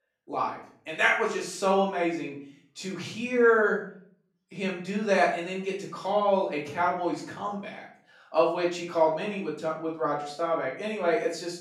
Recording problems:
off-mic speech; far
room echo; noticeable; dies away in 0.5 s

